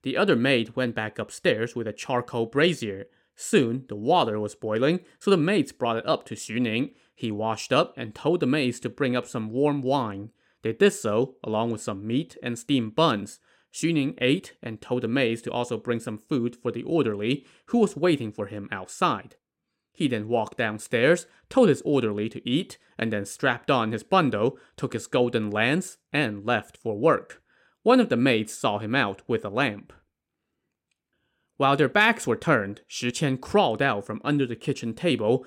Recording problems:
none

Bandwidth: 16 kHz